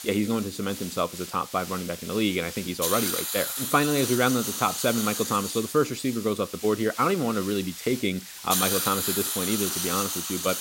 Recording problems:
hiss; loud; throughout; 3 dB below the speech

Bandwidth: 16 kHz